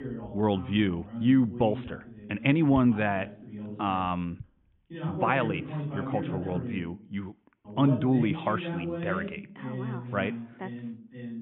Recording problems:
high frequencies cut off; severe; nothing above 3.5 kHz
voice in the background; loud; throughout; 9 dB below the speech

